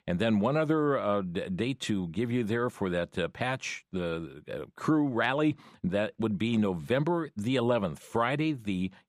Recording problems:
none

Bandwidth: 15 kHz